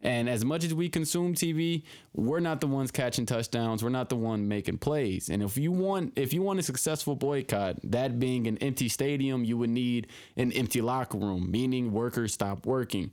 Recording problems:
squashed, flat; heavily

